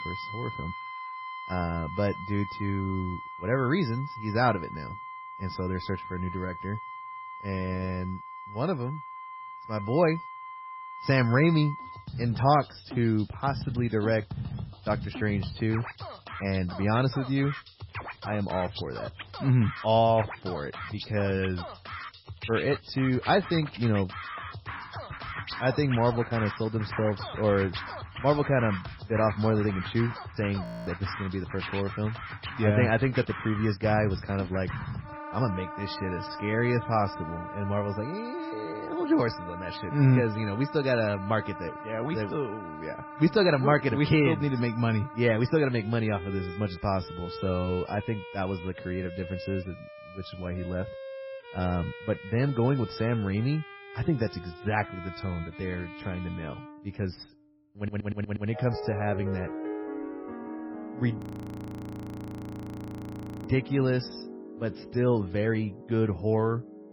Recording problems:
garbled, watery; badly; nothing above 5.5 kHz
background music; noticeable; throughout; 10 dB below the speech
audio freezing; at 31 s and at 1:01 for 2.5 s
audio stuttering; at 58 s

